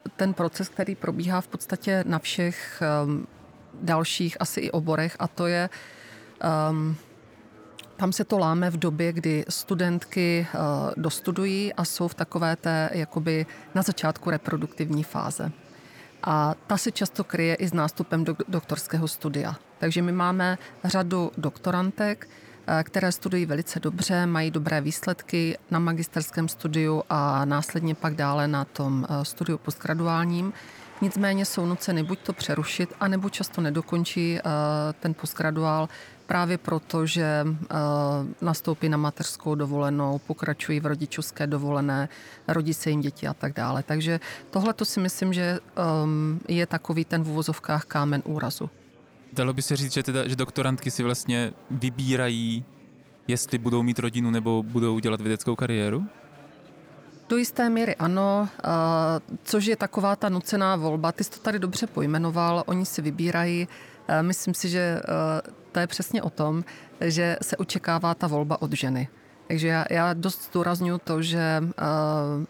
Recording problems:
murmuring crowd; faint; throughout; 25 dB below the speech

